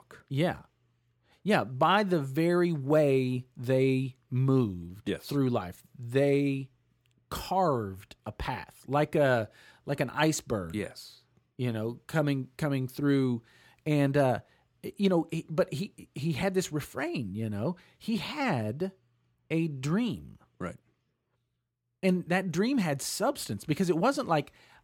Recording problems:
none

